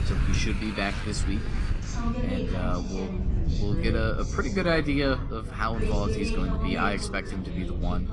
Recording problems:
garbled, watery; slightly
traffic noise; loud; until 2 s; 10 dB below the speech
background chatter; loud; throughout; 3 voices, 6 dB below the speech
wind noise on the microphone; occasional gusts; 15 dB below the speech

